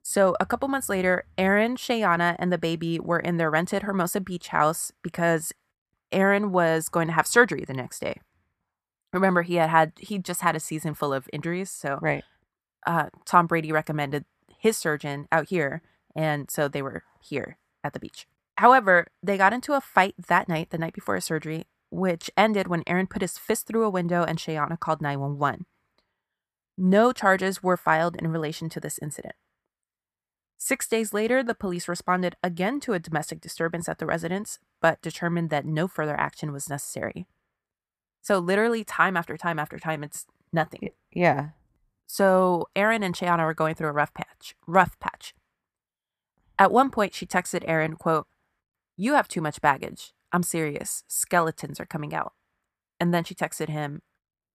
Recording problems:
none

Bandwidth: 14.5 kHz